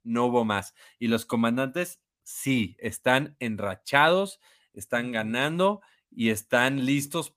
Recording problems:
none

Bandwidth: 15 kHz